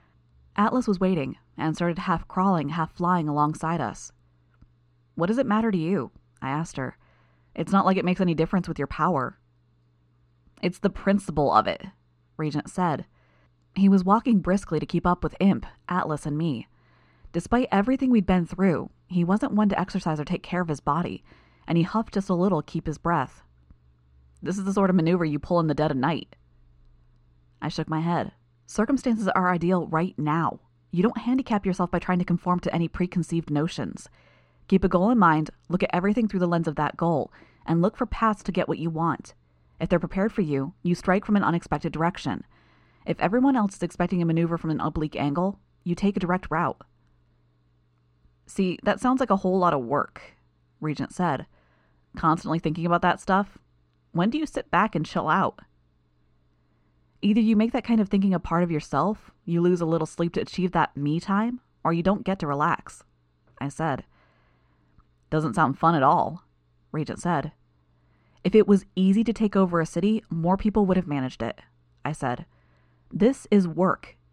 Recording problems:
muffled; slightly; fading above 3.5 kHz

